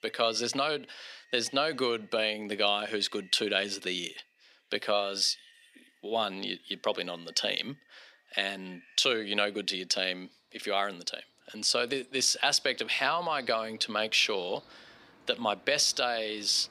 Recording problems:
thin; very slightly; fading below 300 Hz
animal sounds; faint; throughout; 30 dB below the speech

